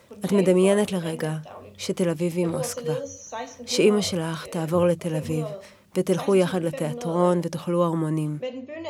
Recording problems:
voice in the background; noticeable; throughout; 10 dB below the speech

